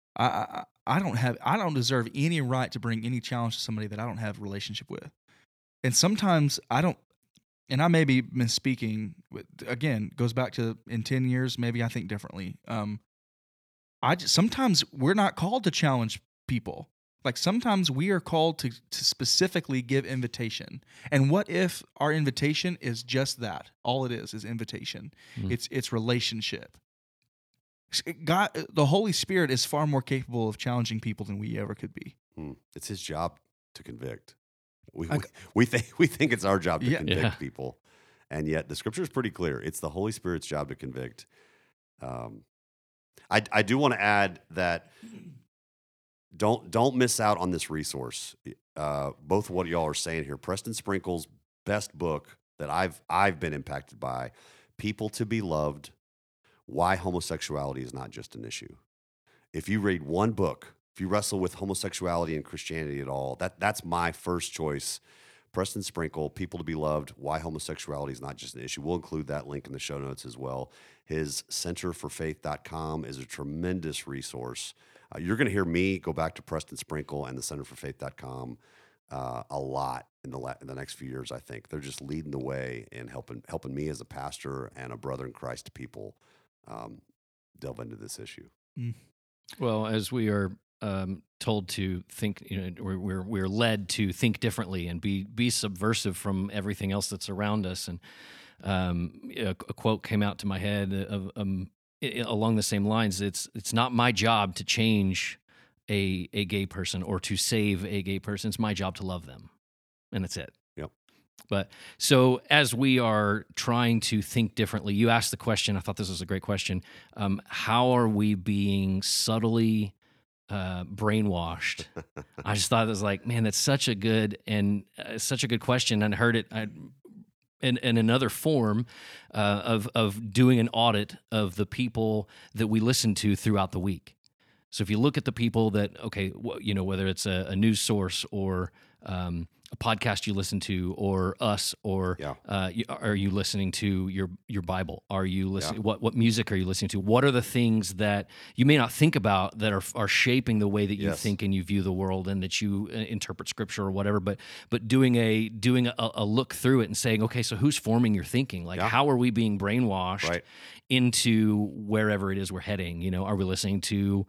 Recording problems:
none

